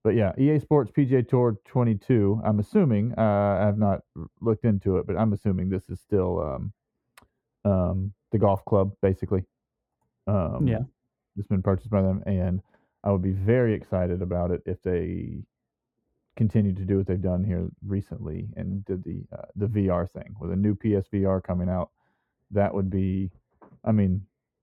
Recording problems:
muffled; very; fading above 2 kHz

